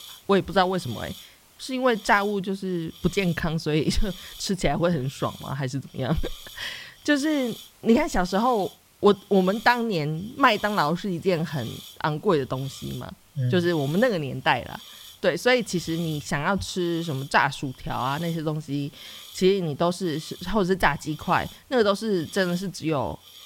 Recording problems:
hiss; noticeable; throughout; 20 dB below the speech

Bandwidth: 16.5 kHz